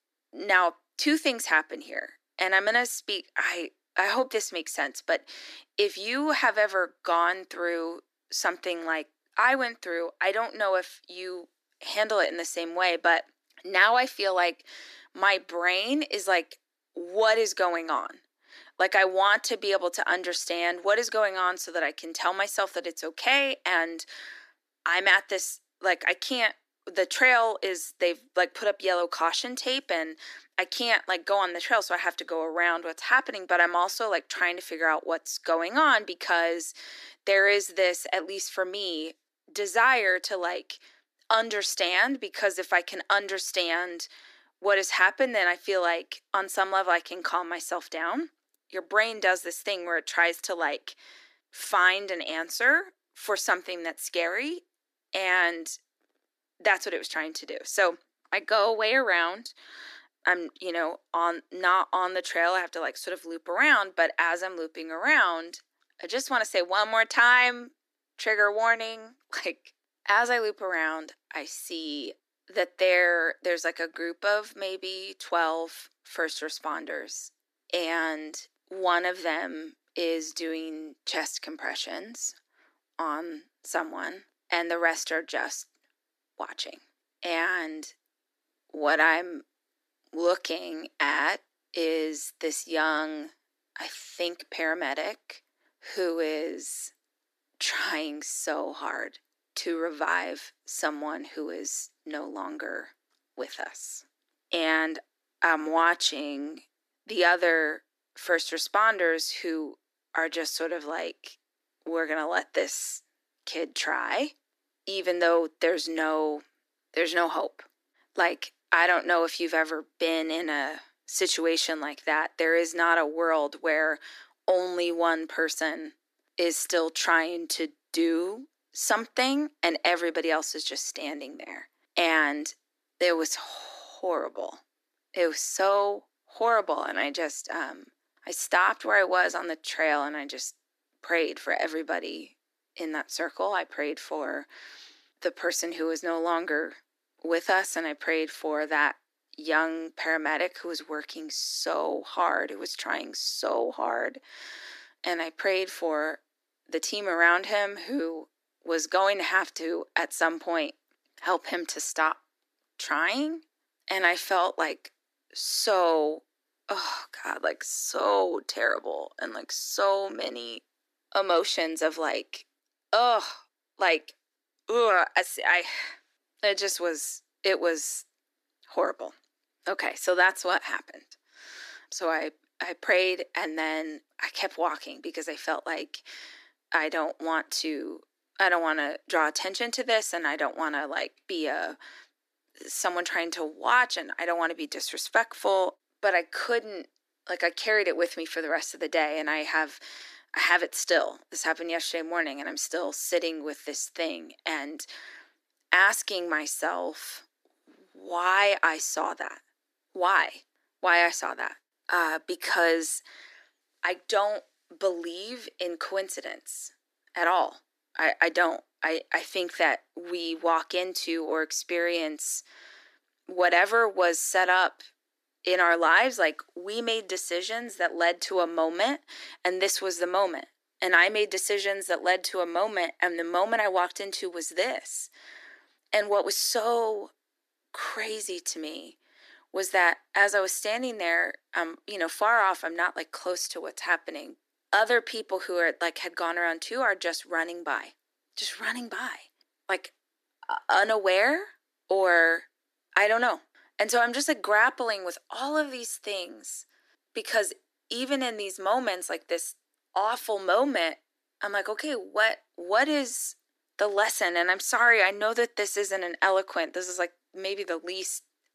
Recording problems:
thin; somewhat; fading below 300 Hz

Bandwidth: 14.5 kHz